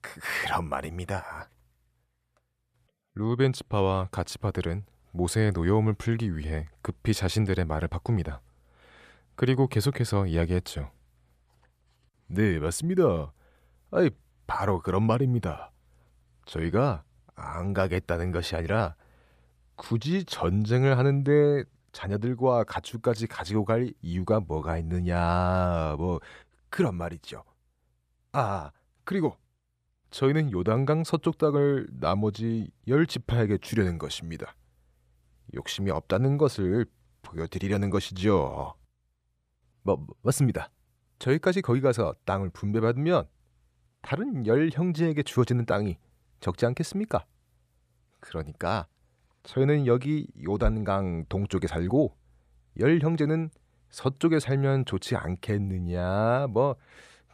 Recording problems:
none

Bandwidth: 14.5 kHz